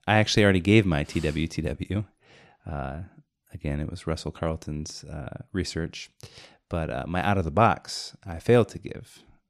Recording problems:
none

